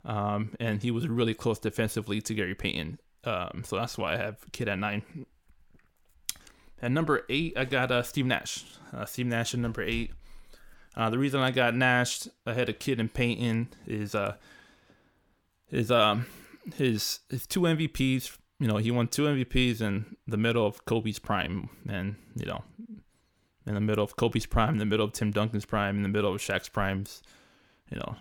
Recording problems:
none

